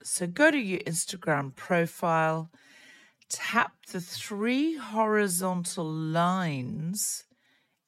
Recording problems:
wrong speed, natural pitch; too slow; 0.6 times normal speed

